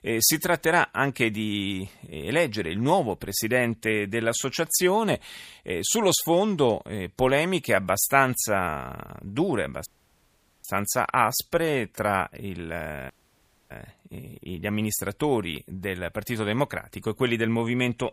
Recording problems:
audio cutting out; at 10 s for 1 s and at 13 s for 0.5 s

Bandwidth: 15 kHz